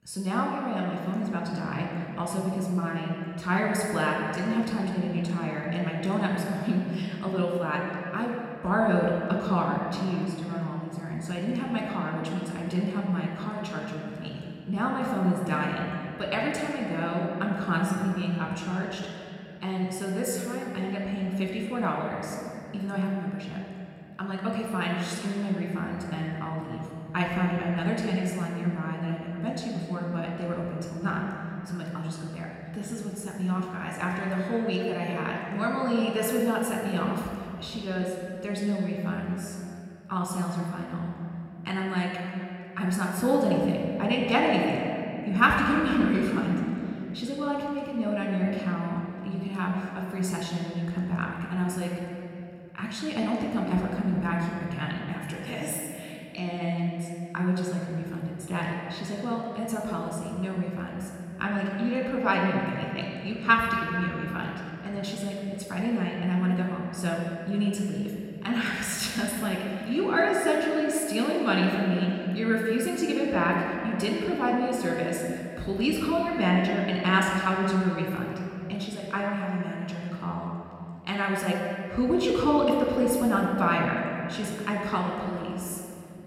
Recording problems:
room echo; noticeable; dies away in 2.6 s
off-mic speech; somewhat distant

